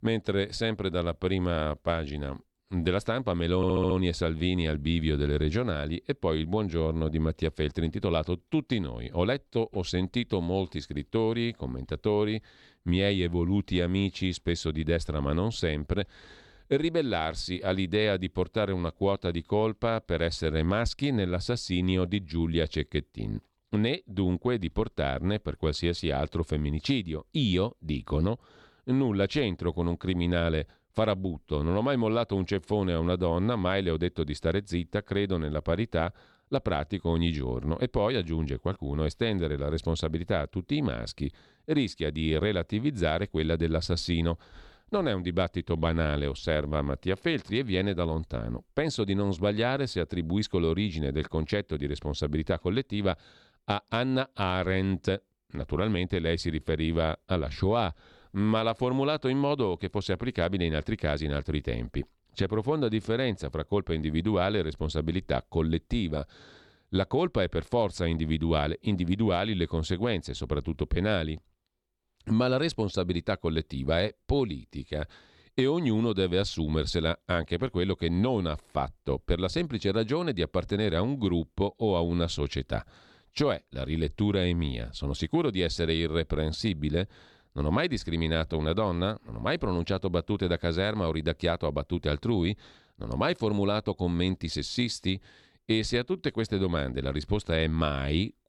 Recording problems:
audio stuttering; at 3.5 s

